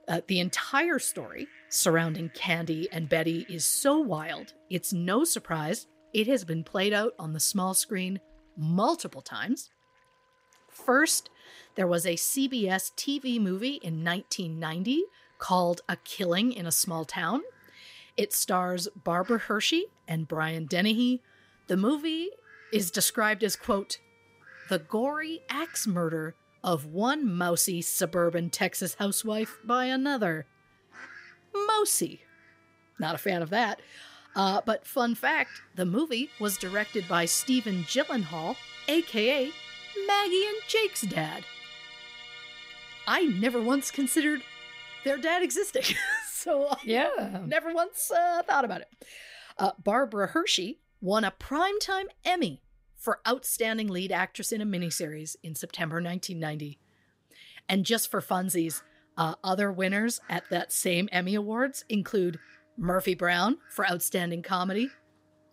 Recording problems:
background music; noticeable; throughout; 15 dB below the speech
animal sounds; faint; throughout; 25 dB below the speech

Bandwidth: 15.5 kHz